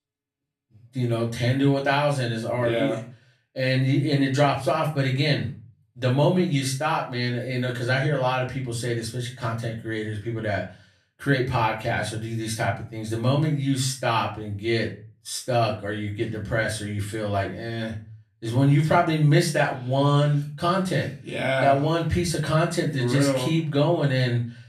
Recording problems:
off-mic speech; far
room echo; slight; dies away in 0.3 s

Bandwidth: 14.5 kHz